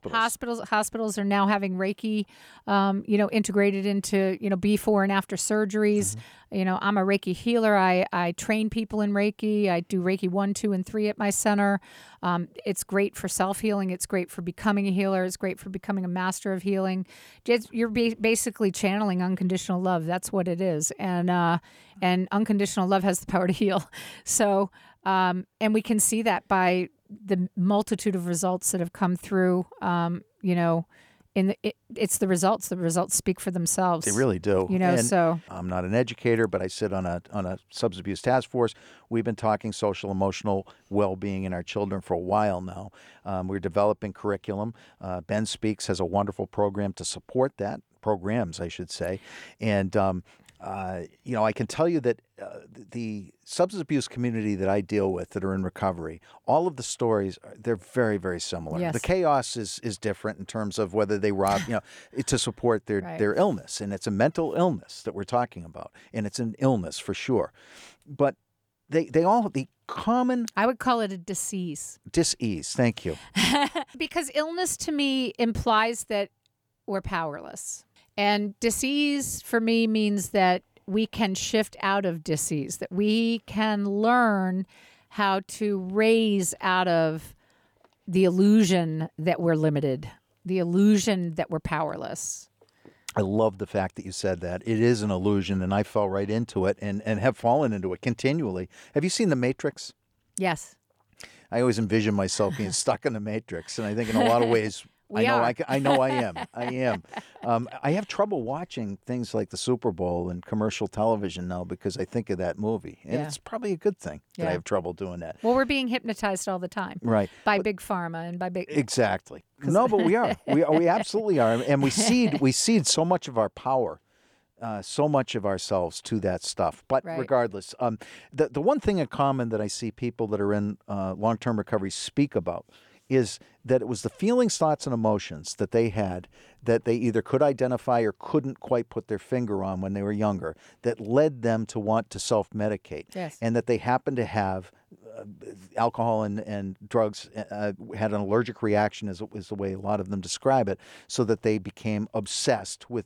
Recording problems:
none

